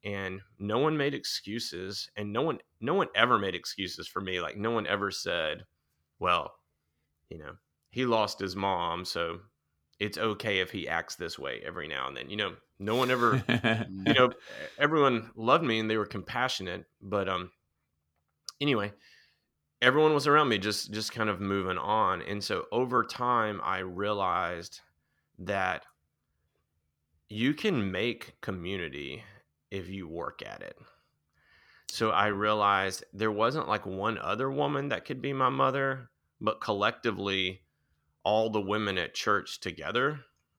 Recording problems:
none

